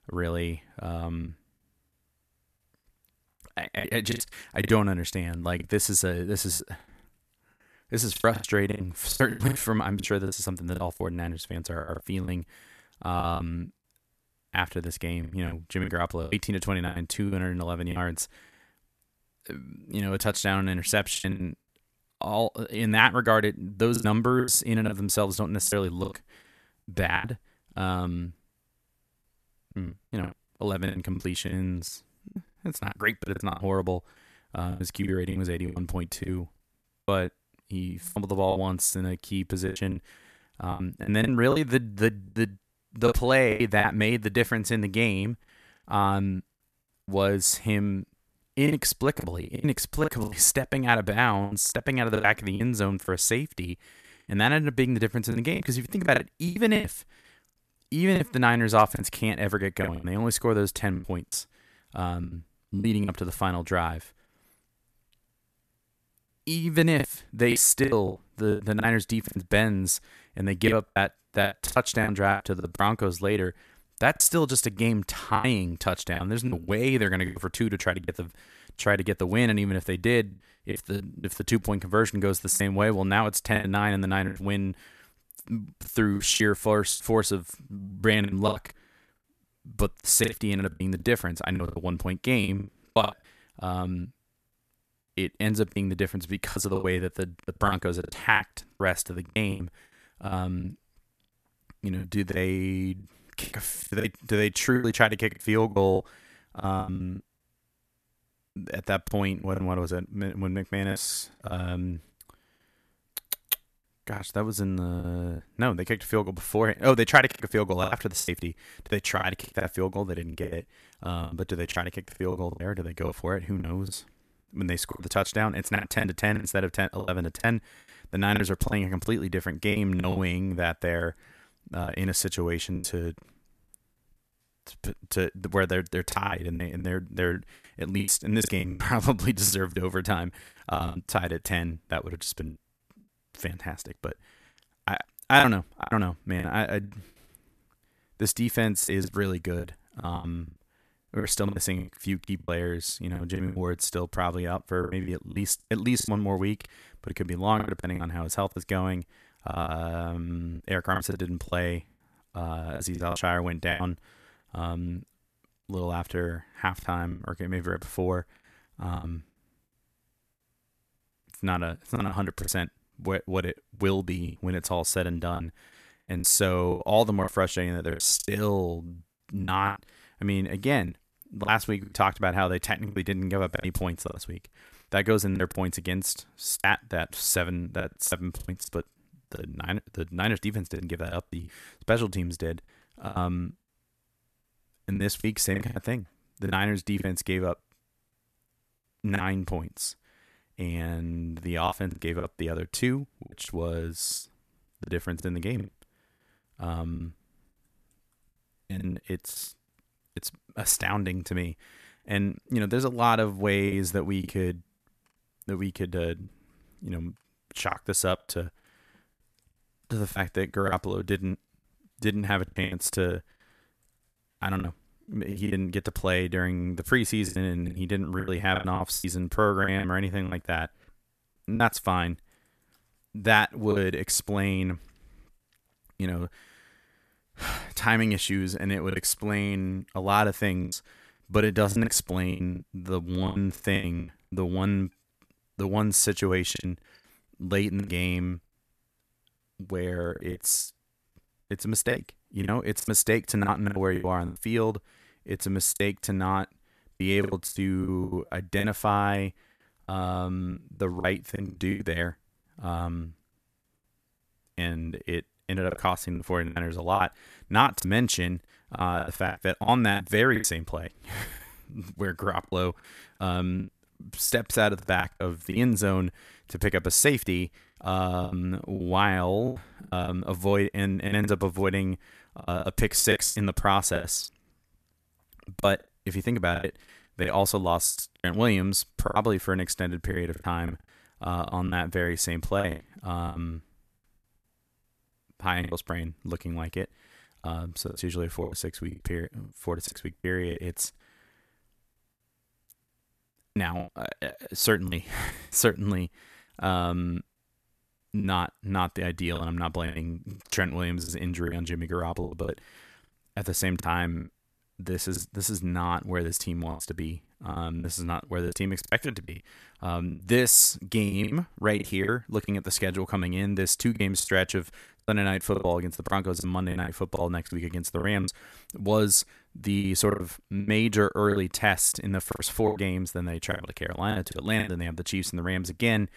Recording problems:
choppy; very; 11% of the speech affected

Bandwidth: 14 kHz